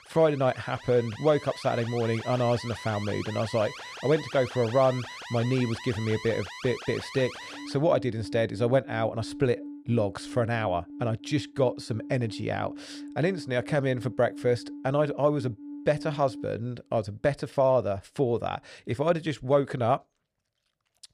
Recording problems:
alarms or sirens; noticeable; throughout; 15 dB below the speech

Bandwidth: 14.5 kHz